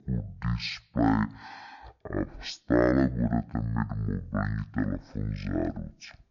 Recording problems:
wrong speed and pitch; too slow and too low; 0.5 times normal speed

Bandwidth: 7 kHz